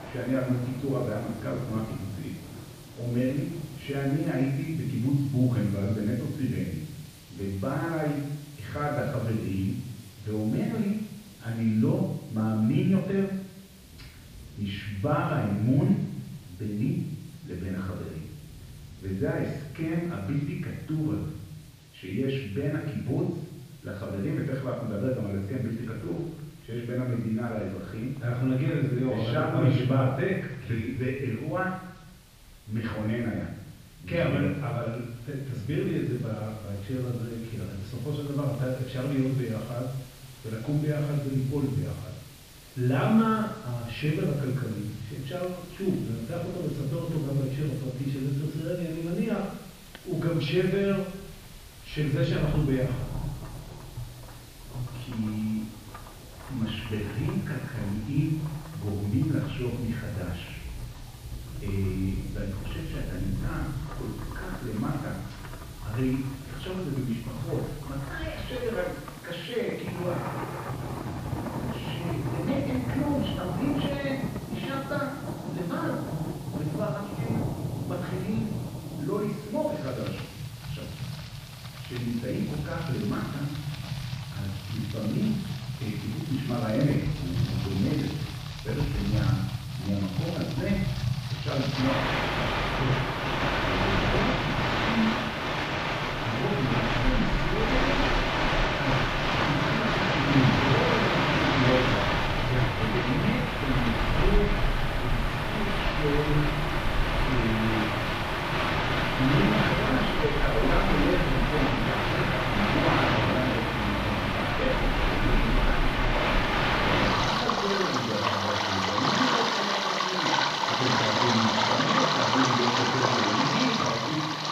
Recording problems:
off-mic speech; far
room echo; noticeable; dies away in 0.8 s
muffled; slightly; fading above 3.5 kHz
rain or running water; very loud; throughout; 2 dB above the speech
hiss; faint; throughout; 20 dB below the speech

